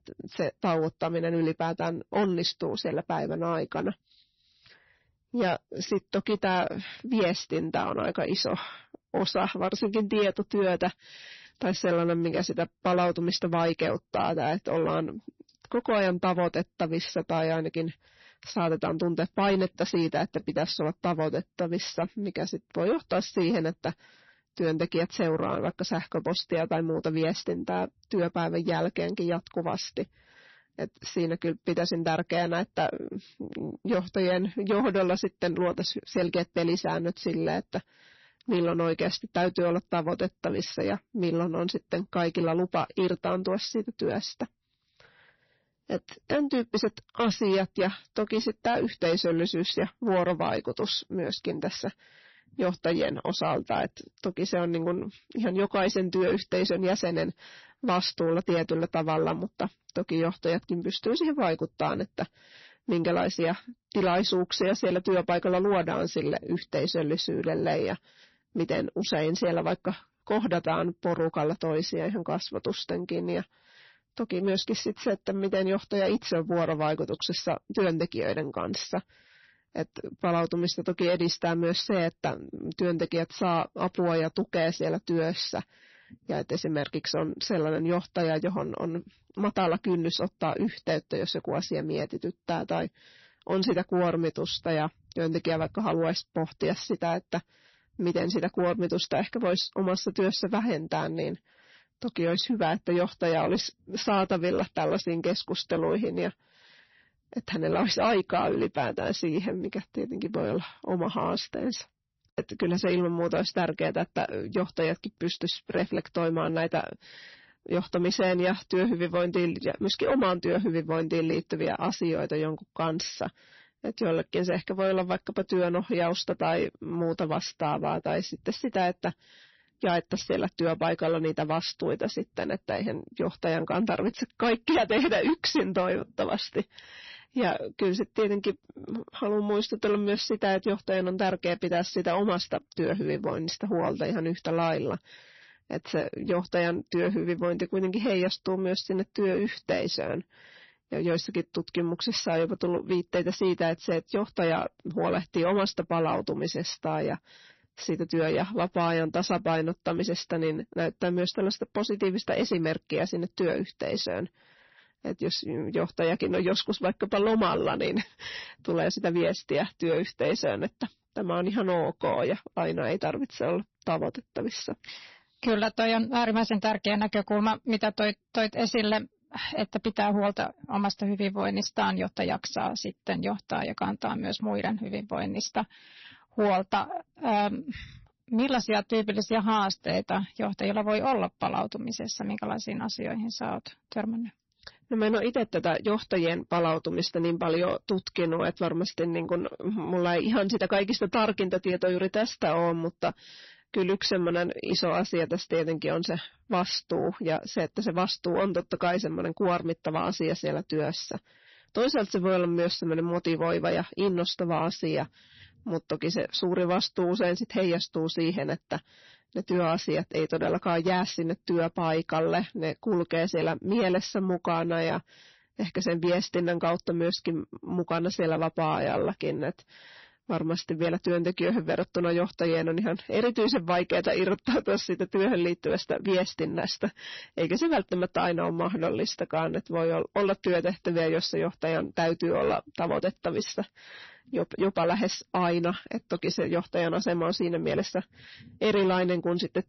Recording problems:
distortion; slight; 10 dB below the speech
garbled, watery; slightly; nothing above 6 kHz

